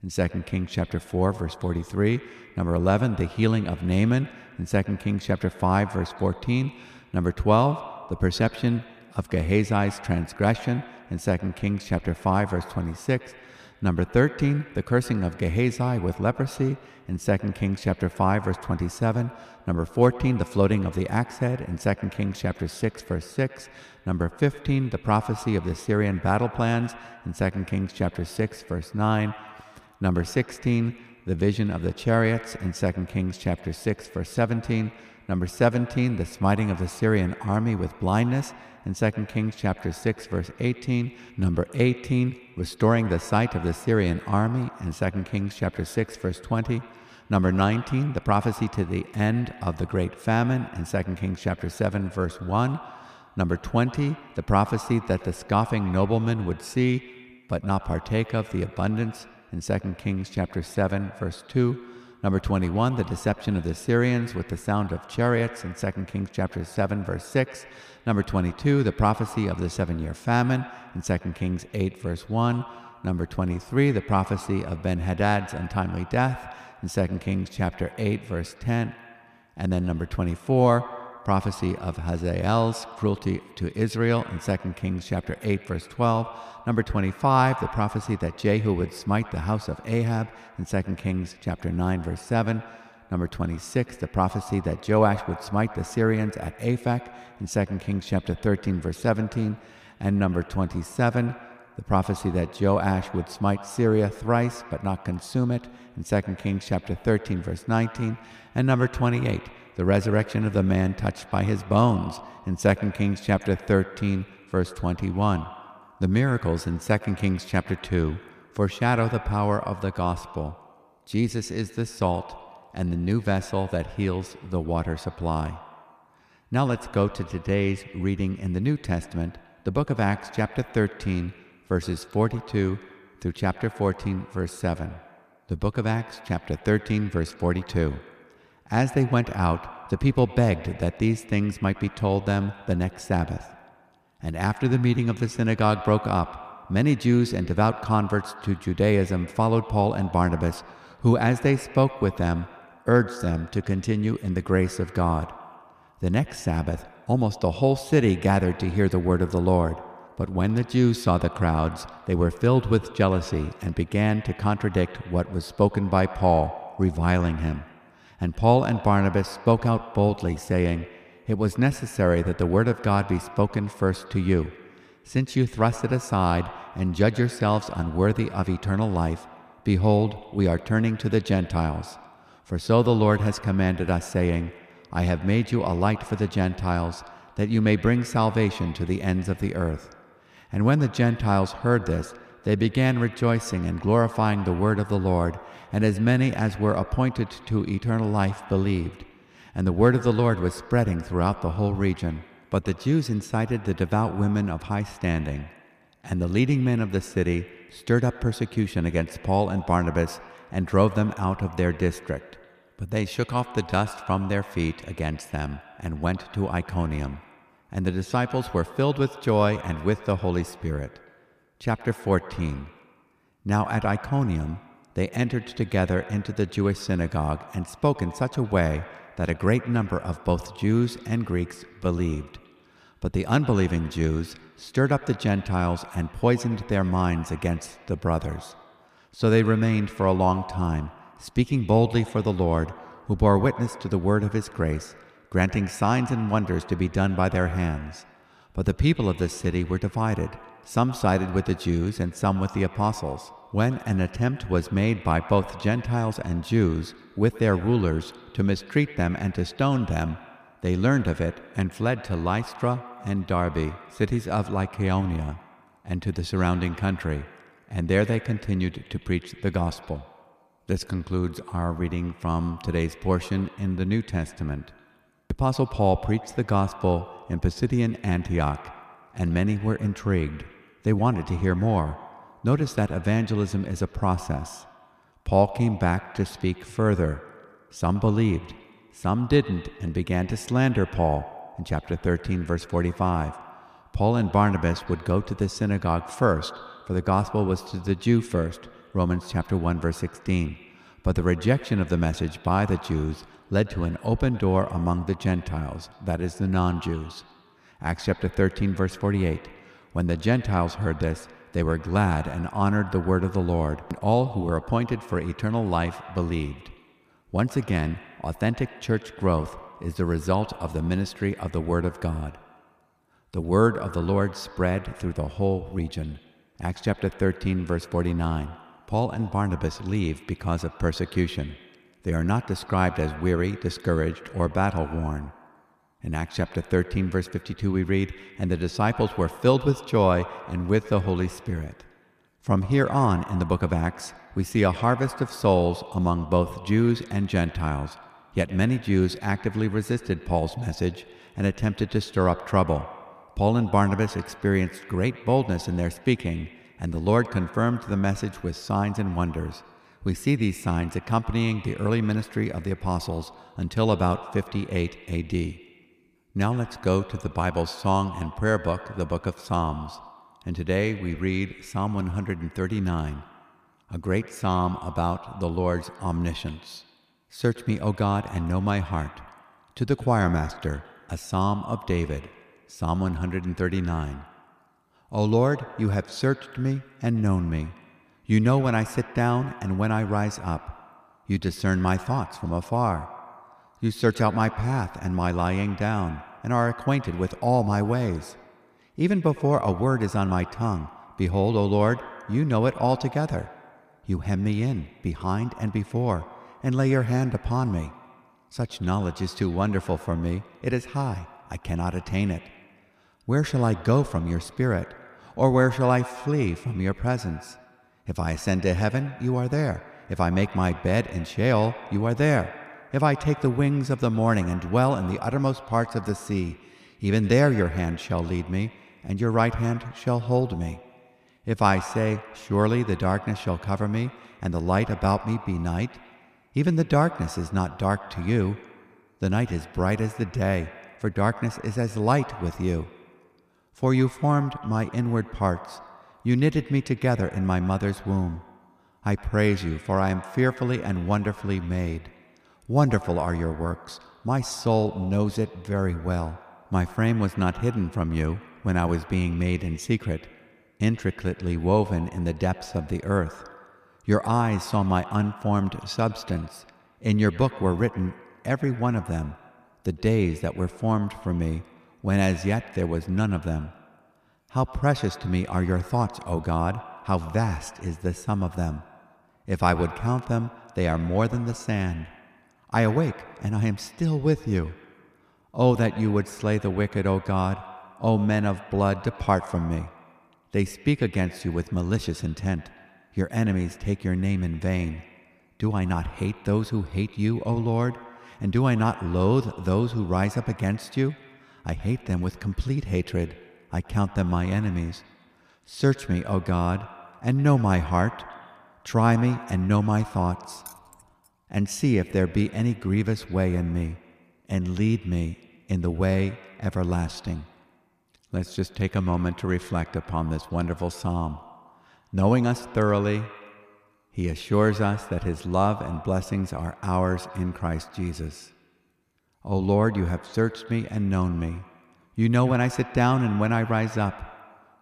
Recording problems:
echo of what is said; noticeable; throughout; 110 ms later, 20 dB below the speech
jangling keys; faint; at 8:31; peak 20 dB below the speech

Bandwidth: 14.5 kHz